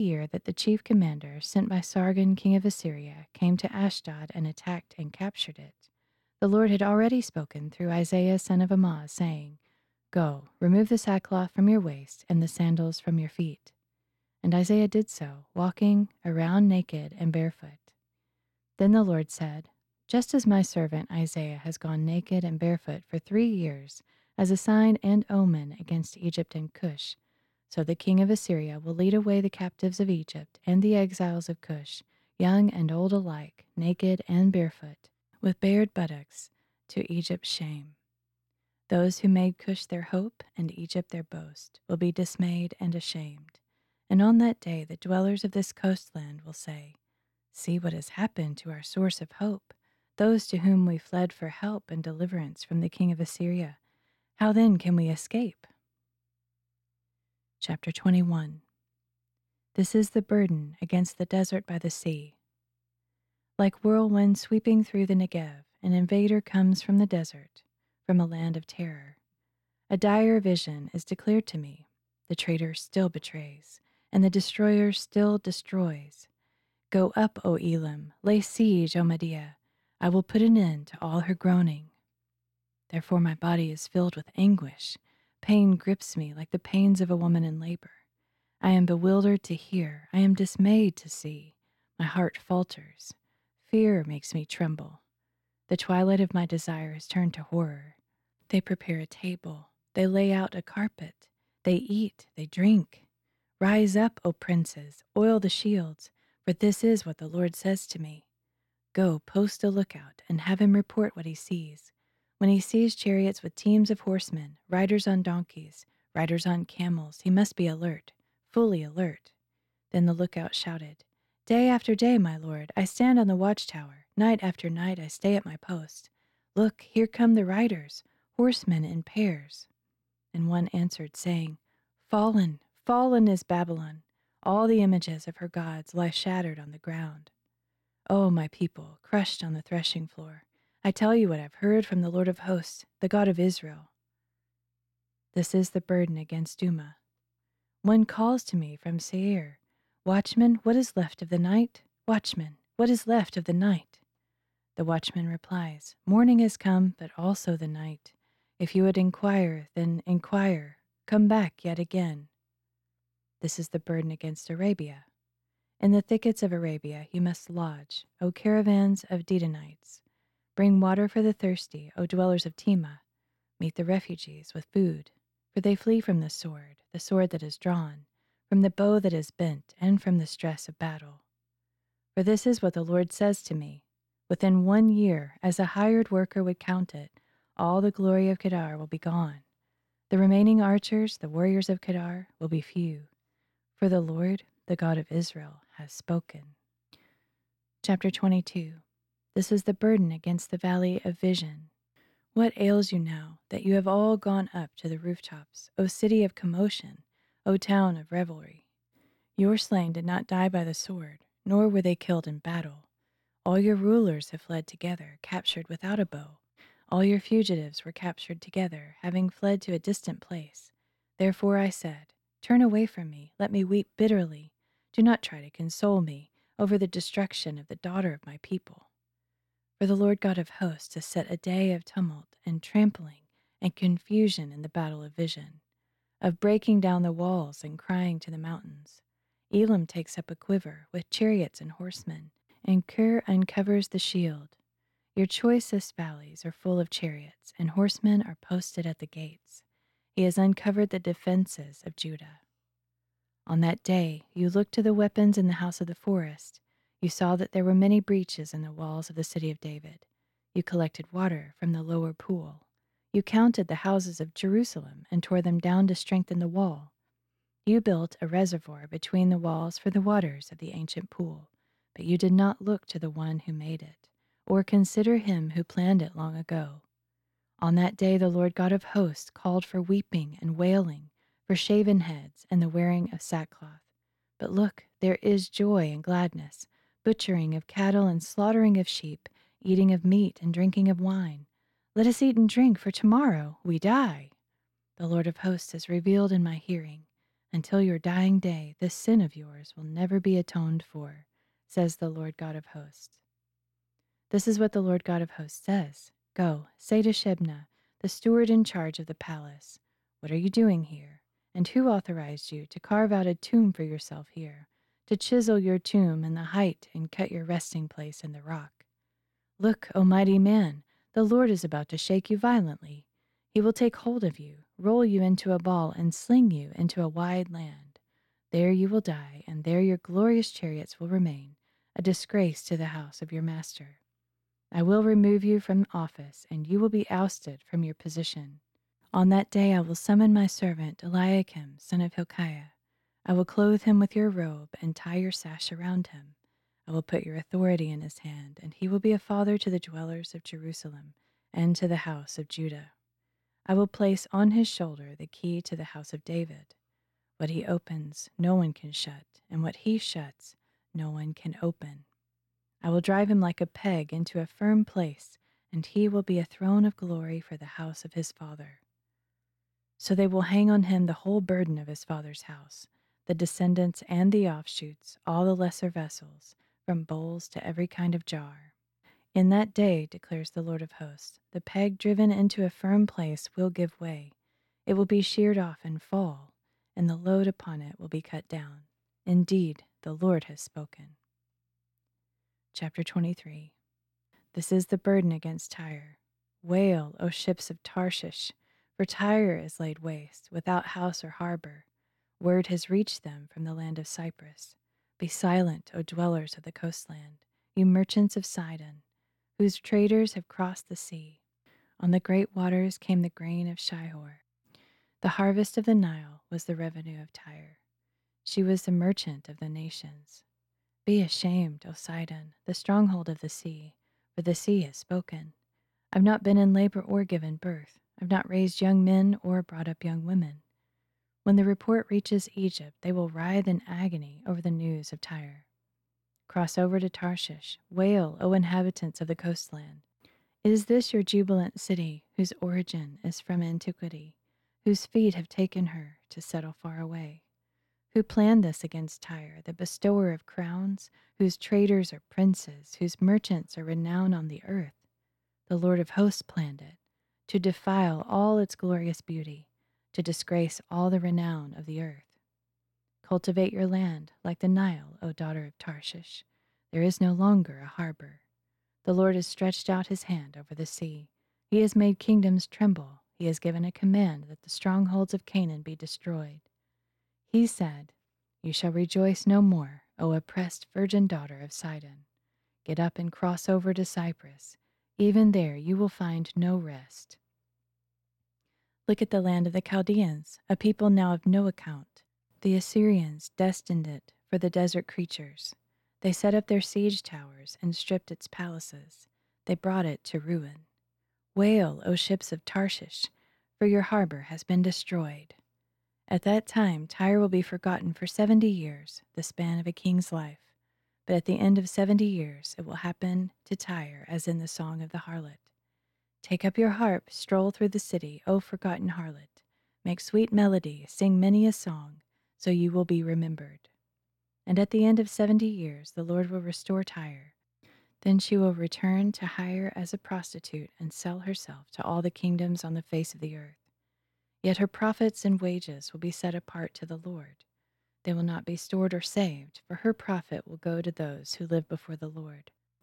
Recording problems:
abrupt cut into speech; at the start

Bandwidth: 18.5 kHz